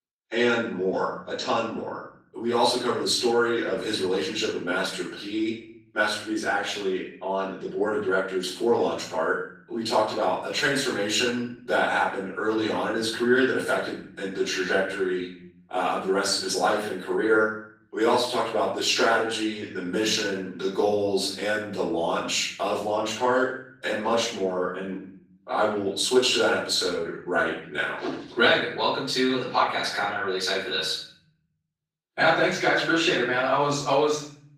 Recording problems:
off-mic speech; far
room echo; noticeable; dies away in 0.7 s
garbled, watery; slightly; nothing above 15.5 kHz
thin; very slightly; fading below 350 Hz

